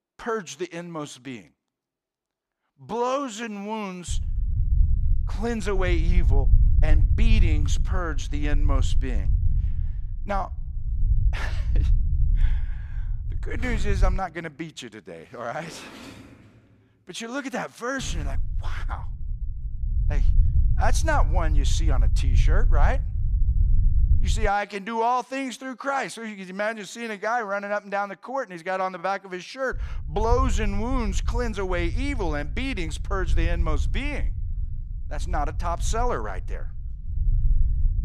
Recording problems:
low rumble; noticeable; from 4 to 14 s, from 18 to 24 s and from 30 s on; 15 dB below the speech
door banging; noticeable; from 14 to 18 s; peak 8 dB below the speech

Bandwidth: 14.5 kHz